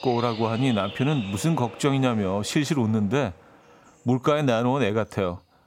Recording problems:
animal sounds; noticeable; throughout; 15 dB below the speech

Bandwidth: 16.5 kHz